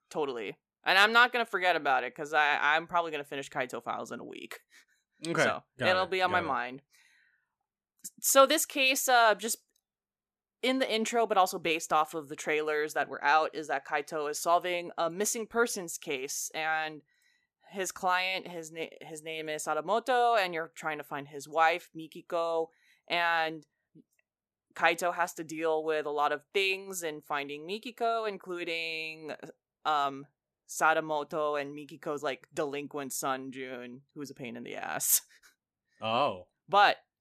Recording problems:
none

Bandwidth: 14.5 kHz